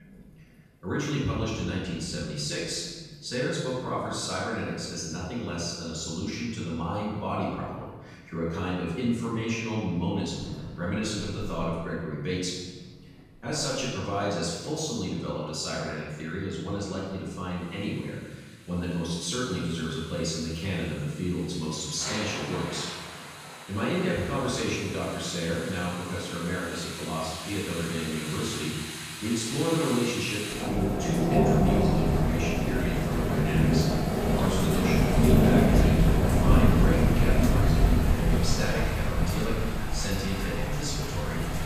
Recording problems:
room echo; strong; dies away in 1.2 s
off-mic speech; far
rain or running water; very loud; throughout; 4 dB above the speech

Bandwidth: 15 kHz